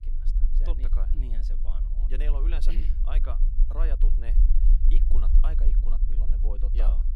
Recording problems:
low rumble; loud; throughout; 6 dB below the speech

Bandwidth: 15 kHz